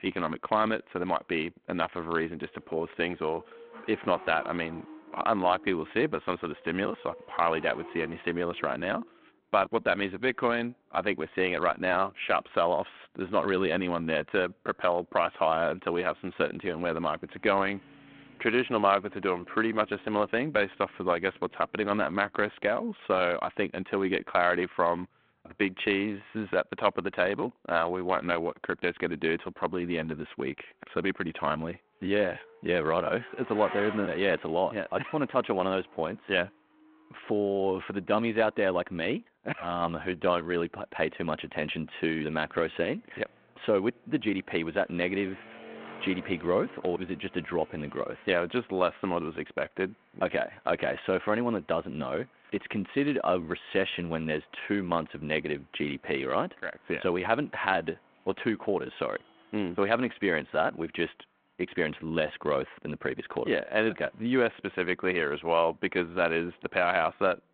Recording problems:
phone-call audio; nothing above 3.5 kHz
traffic noise; faint; throughout; 20 dB below the speech

